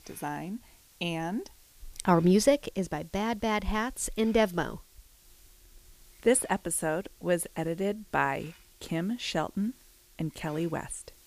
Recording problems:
hiss; faint; throughout; 25 dB below the speech

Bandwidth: 15 kHz